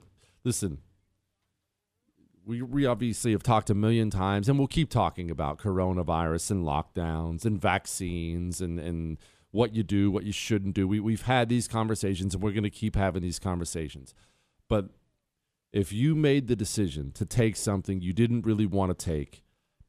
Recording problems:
none

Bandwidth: 14.5 kHz